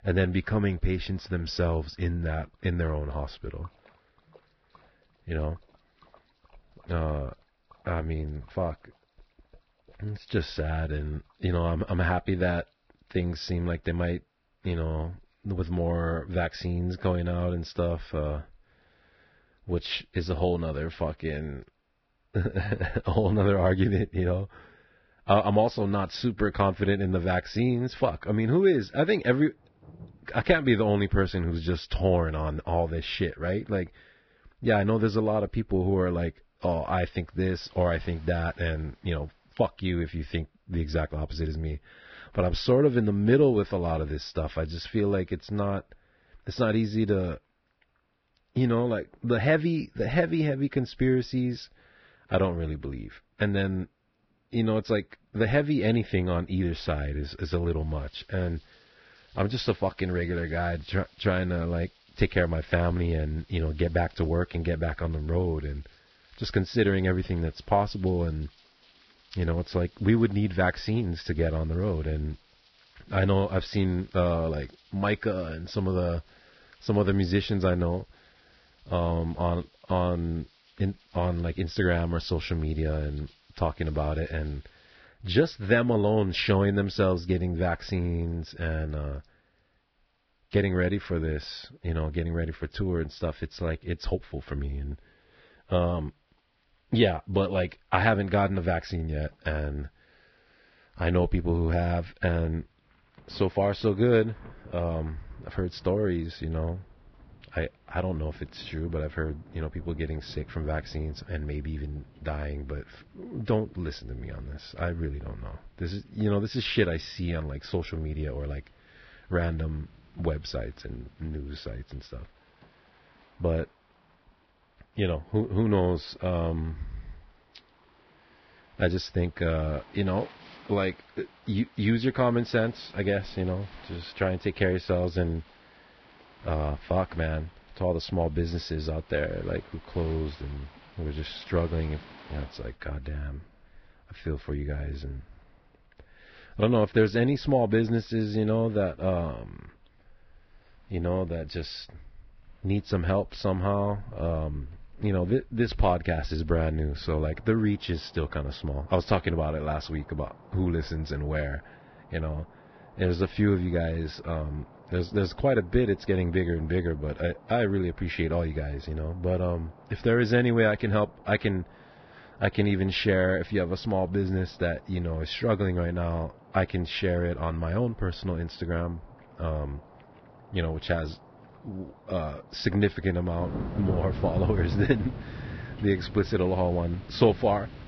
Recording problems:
garbled, watery; badly; nothing above 5.5 kHz
rain or running water; noticeable; throughout; 20 dB below the speech

